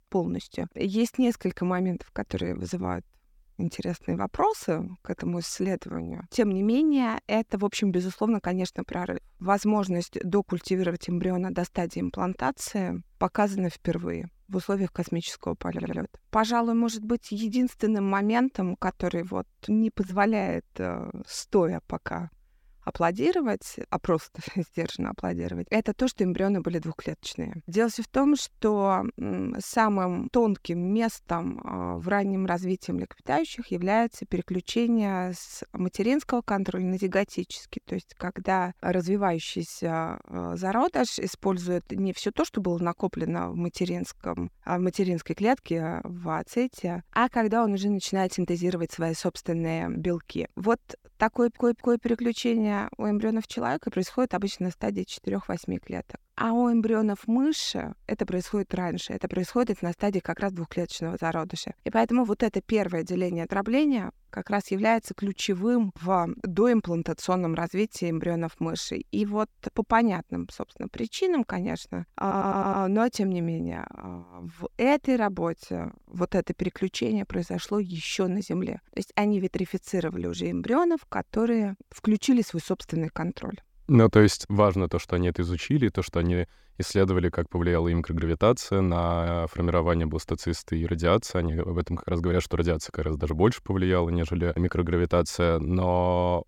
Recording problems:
audio stuttering; at 16 s, at 51 s and at 1:12

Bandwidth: 17.5 kHz